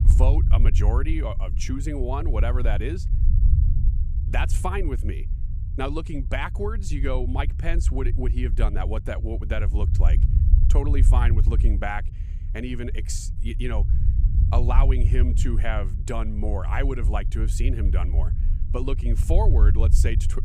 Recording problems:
low rumble; loud; throughout; 10 dB below the speech

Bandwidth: 15 kHz